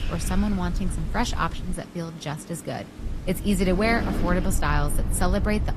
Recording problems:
garbled, watery; slightly; nothing above 13.5 kHz
wind noise on the microphone; occasional gusts; 15 dB below the speech
low rumble; noticeable; until 1.5 s and from 3 s on; 20 dB below the speech
rain or running water; faint; throughout; 25 dB below the speech
wind in the background; faint; throughout; 20 dB below the speech

